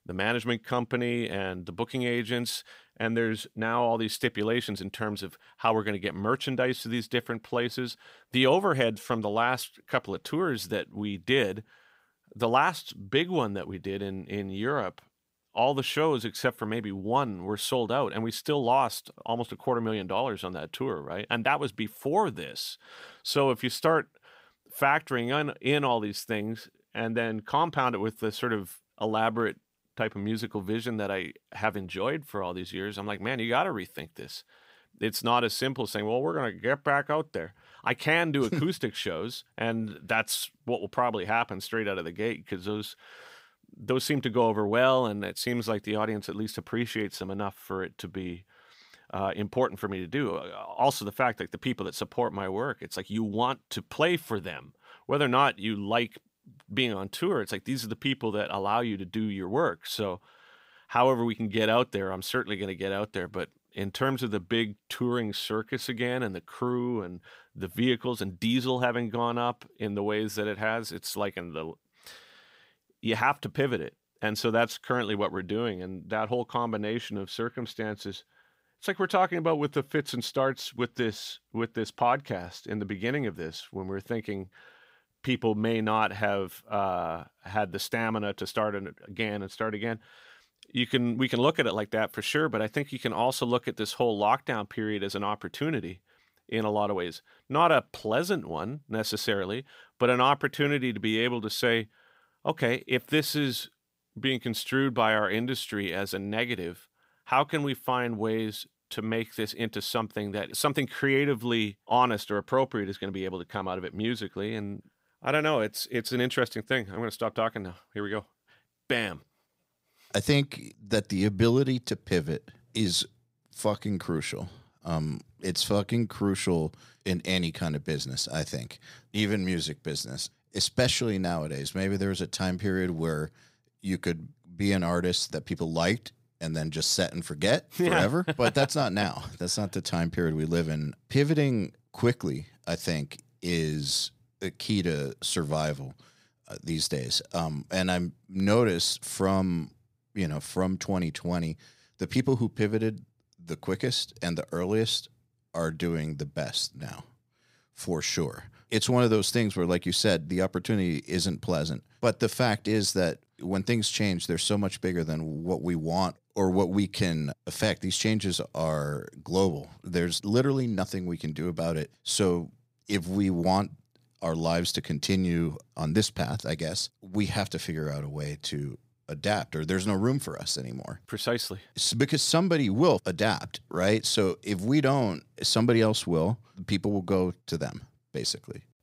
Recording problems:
none

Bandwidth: 15.5 kHz